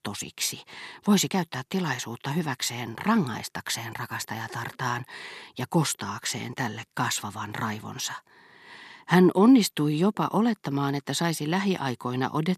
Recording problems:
none

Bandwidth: 13.5 kHz